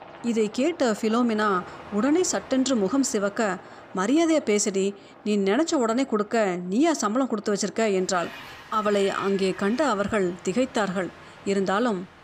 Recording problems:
train or aircraft noise; noticeable; throughout; 20 dB below the speech

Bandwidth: 15 kHz